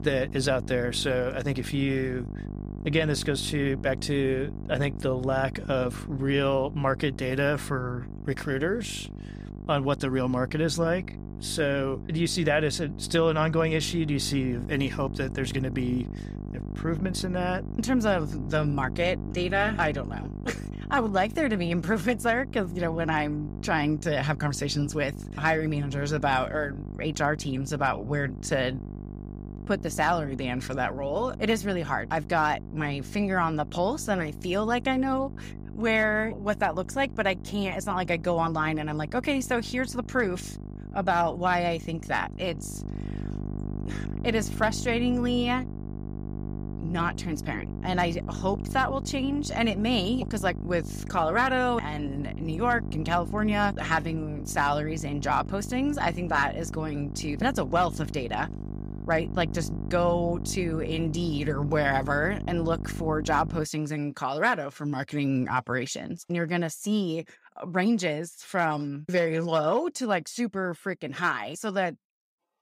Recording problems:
electrical hum; noticeable; until 1:04; 50 Hz, 15 dB below the speech

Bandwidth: 15.5 kHz